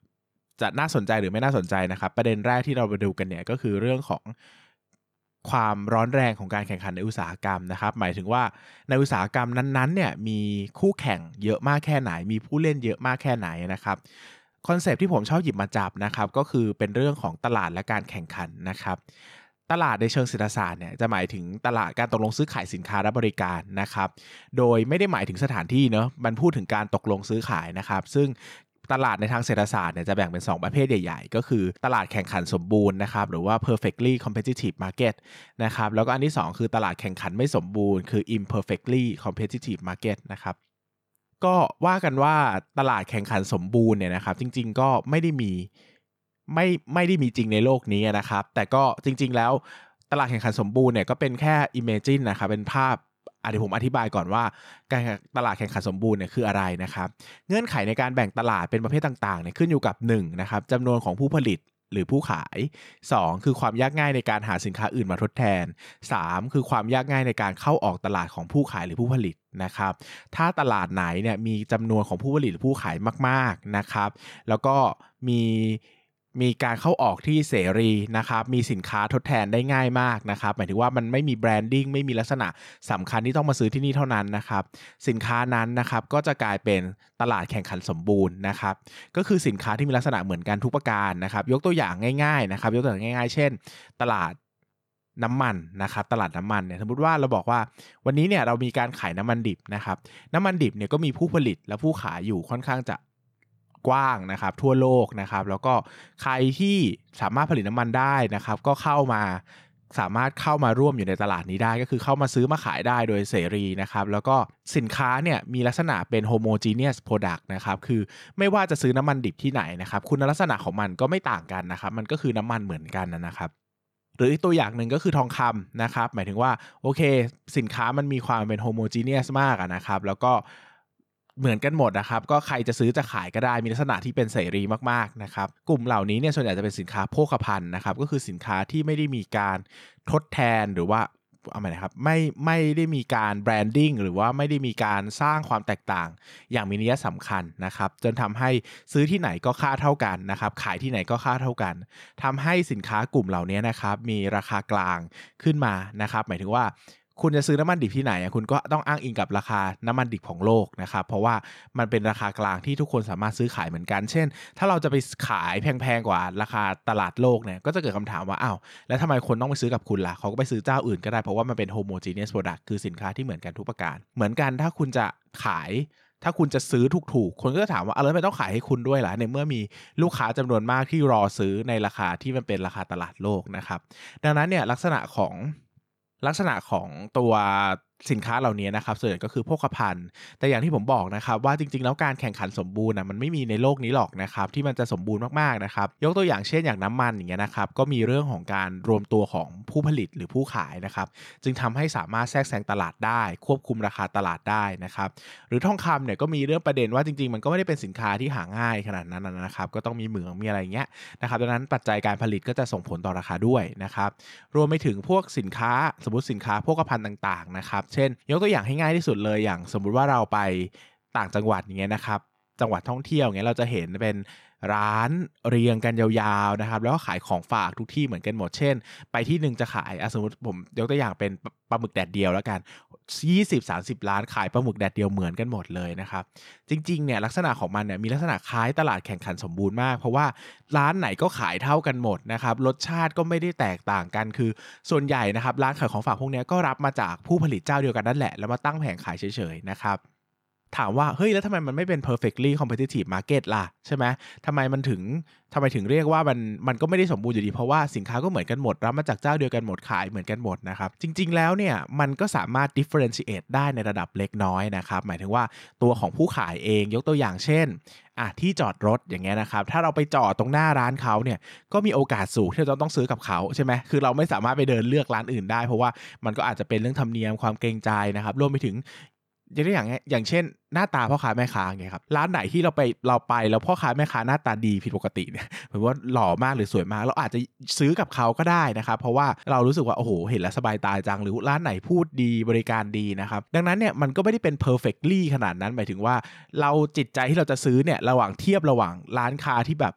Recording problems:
none

